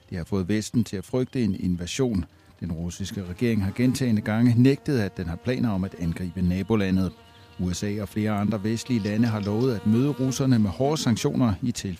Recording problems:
electrical hum; noticeable; throughout; 50 Hz, 20 dB below the speech

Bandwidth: 15 kHz